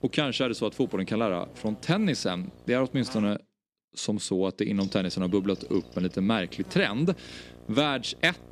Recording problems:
electrical hum; faint; until 3.5 s and from 5 s on; 60 Hz, 20 dB below the speech

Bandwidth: 14.5 kHz